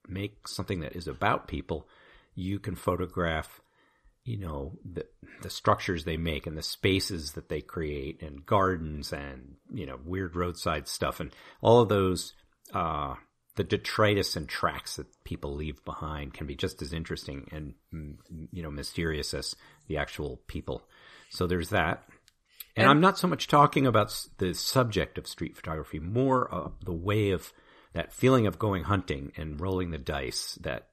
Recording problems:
none

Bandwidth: 14.5 kHz